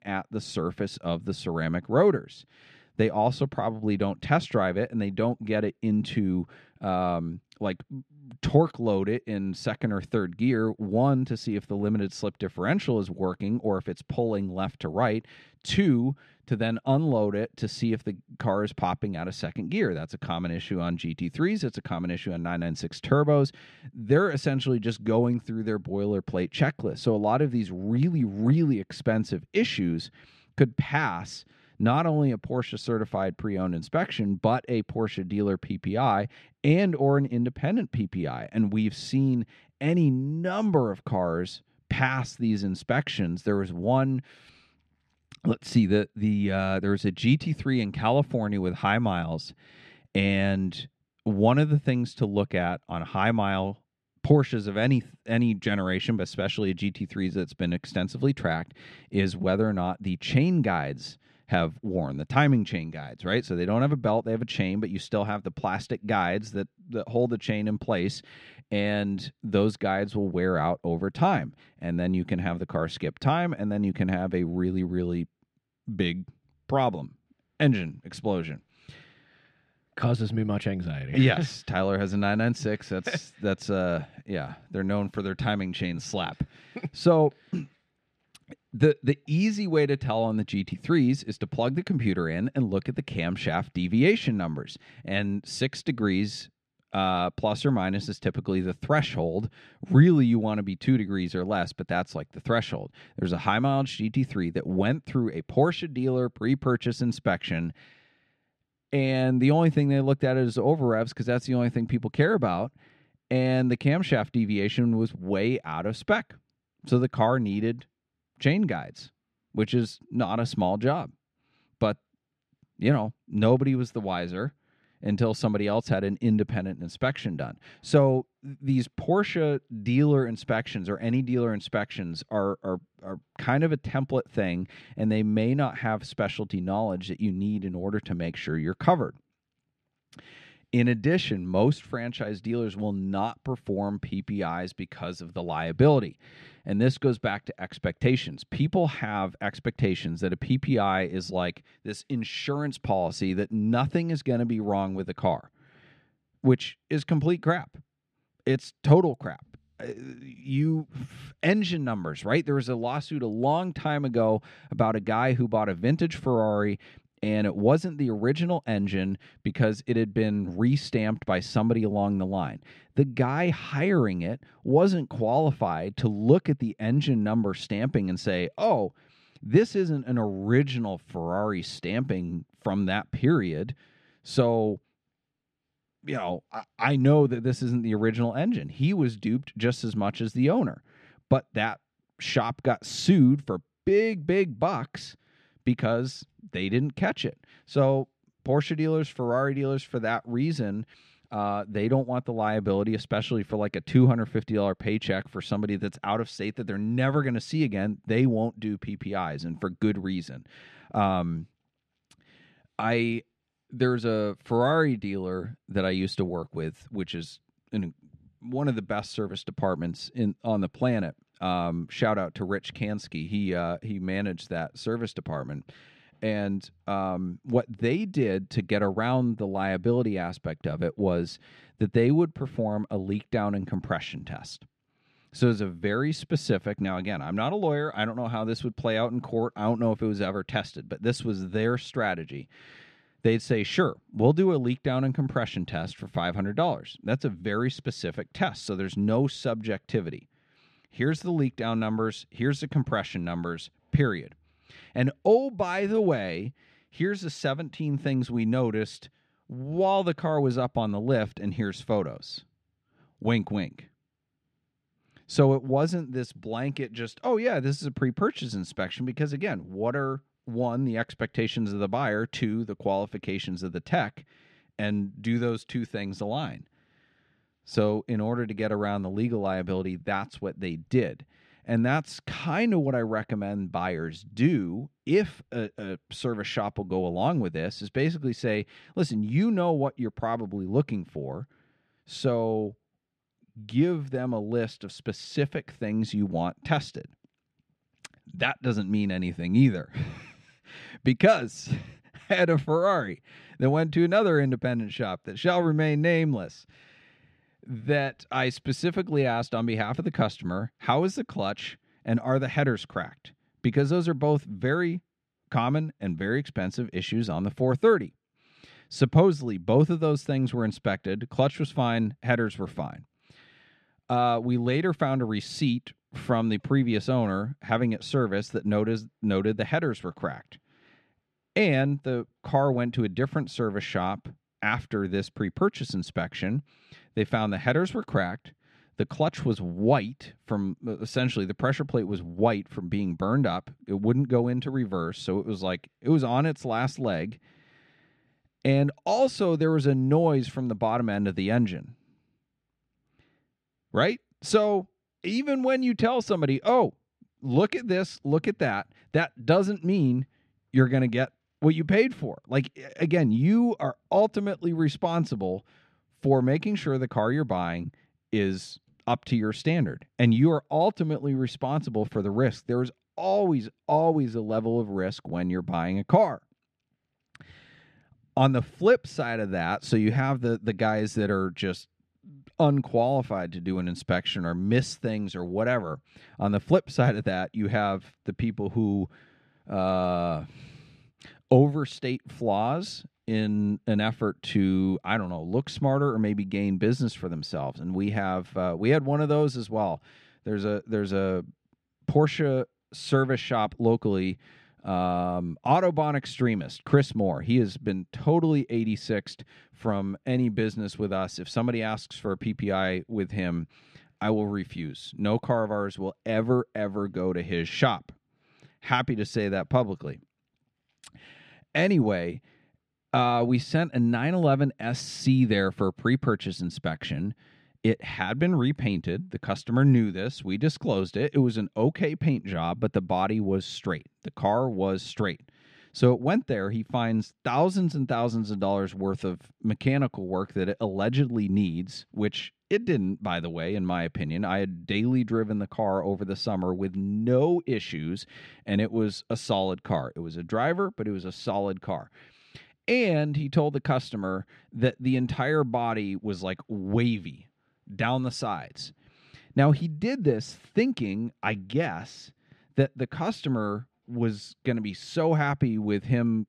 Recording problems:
muffled; slightly; fading above 3 kHz

